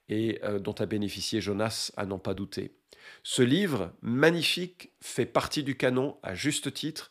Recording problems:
none

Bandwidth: 15 kHz